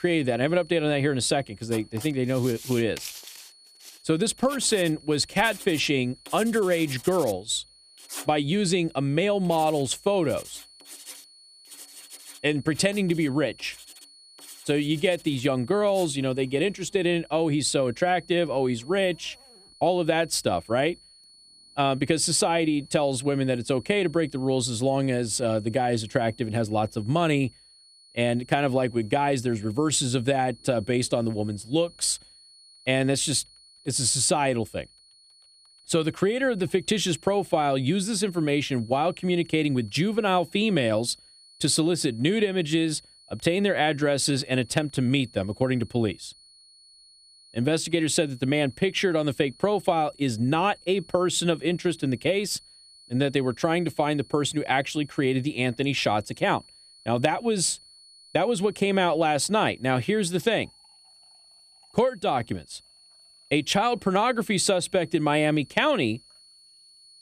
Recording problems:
household noises; noticeable; throughout; 20 dB below the speech
high-pitched whine; faint; throughout; 4.5 kHz, 25 dB below the speech

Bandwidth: 14.5 kHz